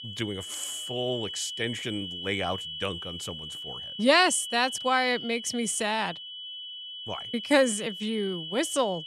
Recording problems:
high-pitched whine; loud; throughout; 3 kHz, 8 dB below the speech

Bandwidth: 14.5 kHz